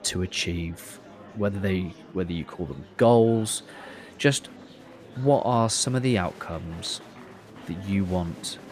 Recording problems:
murmuring crowd; faint; throughout; 20 dB below the speech

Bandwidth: 14.5 kHz